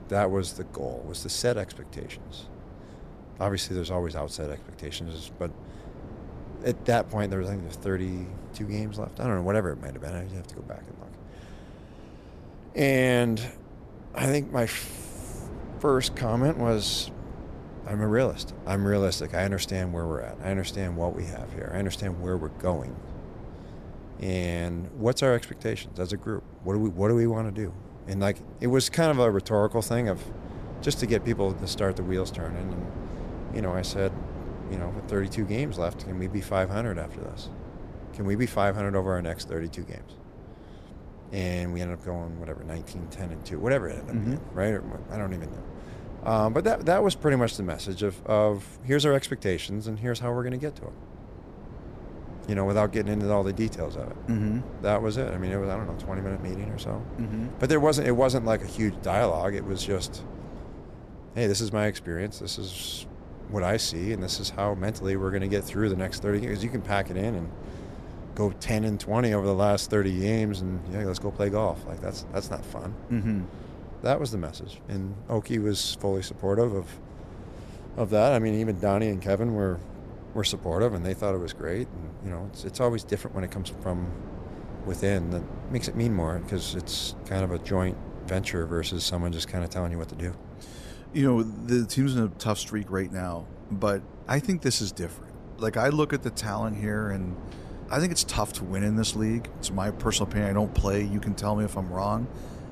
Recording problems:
wind noise on the microphone; occasional gusts; 15 dB below the speech

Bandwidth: 14 kHz